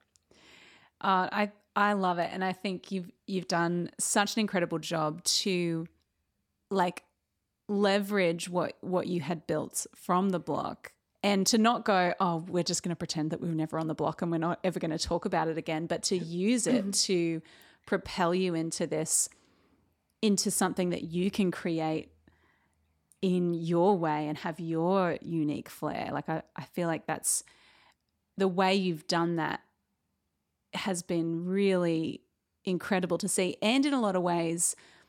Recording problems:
none

